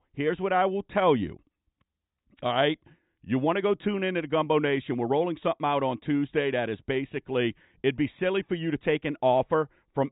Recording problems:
high frequencies cut off; severe; nothing above 4 kHz

